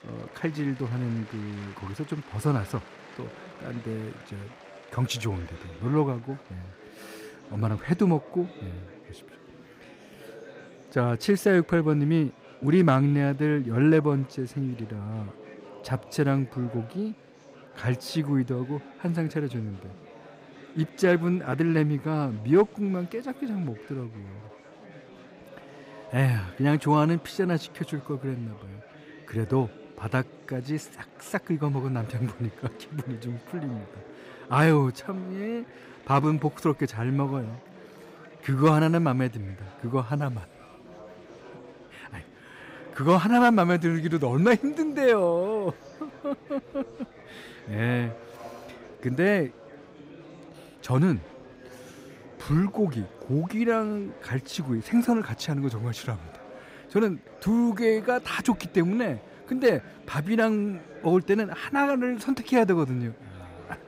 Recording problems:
murmuring crowd; faint; throughout; 20 dB below the speech

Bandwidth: 15.5 kHz